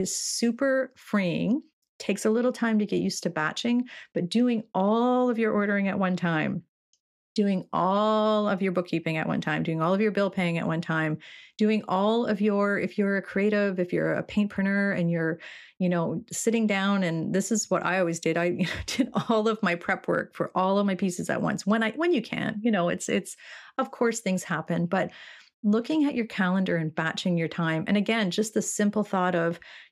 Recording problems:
abrupt cut into speech; at the start

